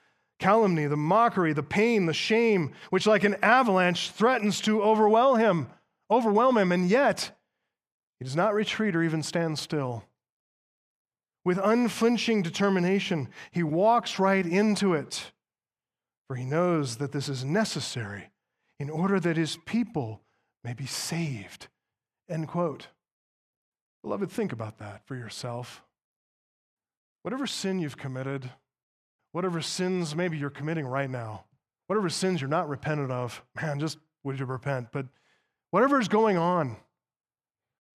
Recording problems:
none

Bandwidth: 14.5 kHz